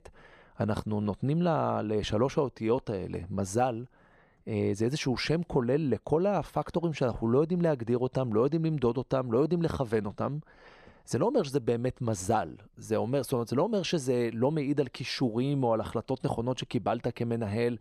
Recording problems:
none

